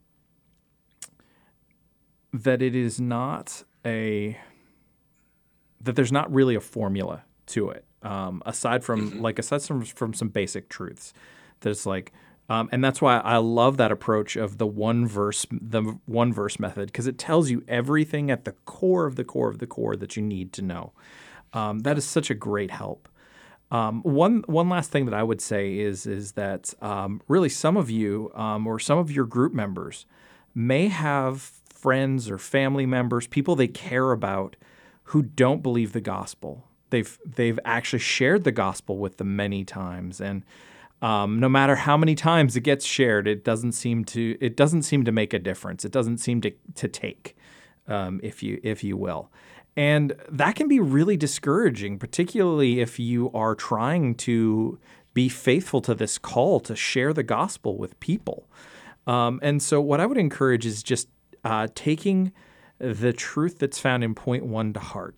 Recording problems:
none

